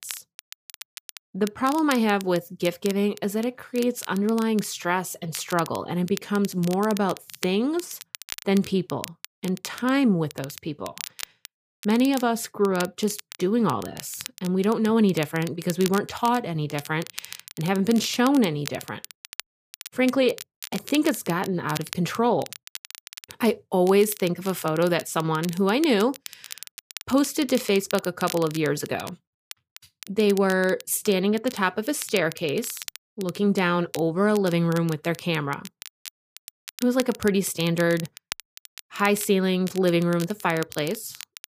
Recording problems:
crackle, like an old record; noticeable; 15 dB below the speech

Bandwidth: 15 kHz